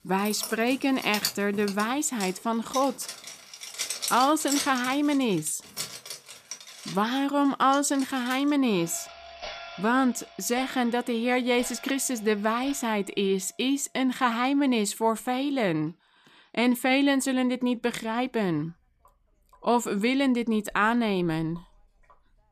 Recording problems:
household noises; noticeable; throughout; 10 dB below the speech

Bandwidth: 14.5 kHz